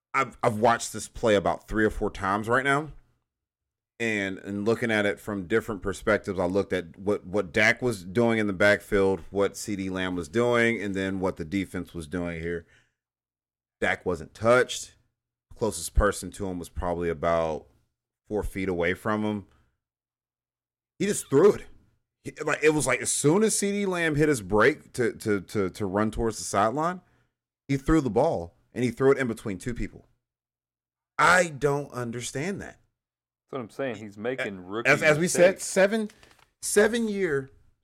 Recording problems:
none

